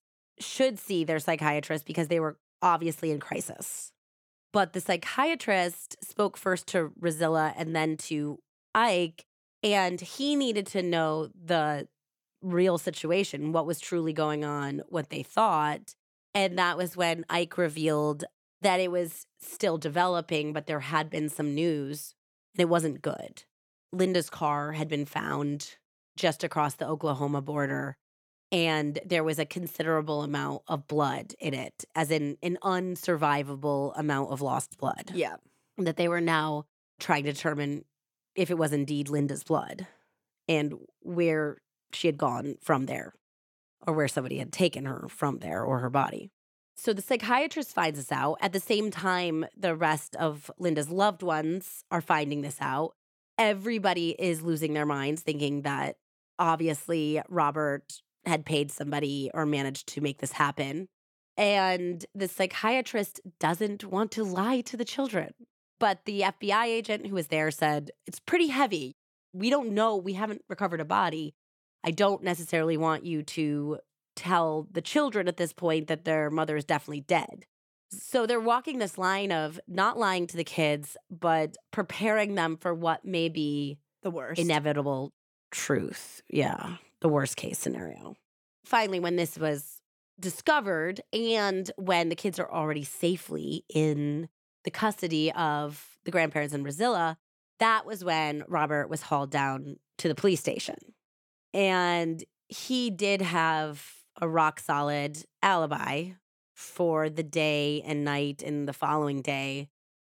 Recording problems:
none

